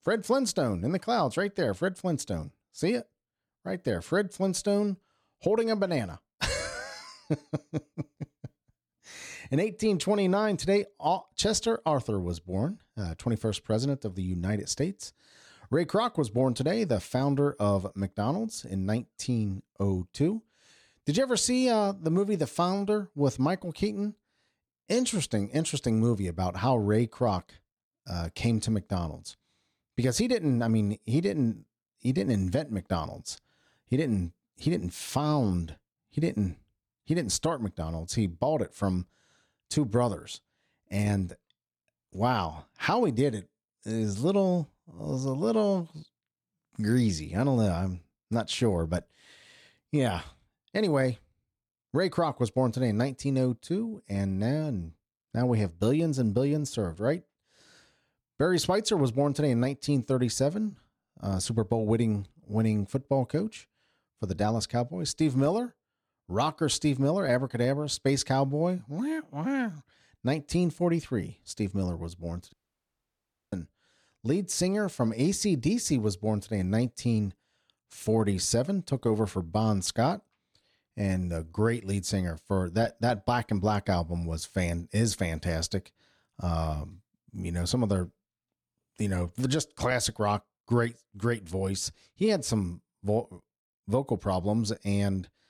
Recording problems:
audio cutting out; at 1:13 for 1 s

